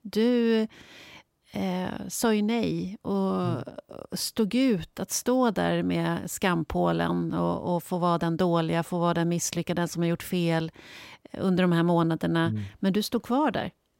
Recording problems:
none

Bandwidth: 16 kHz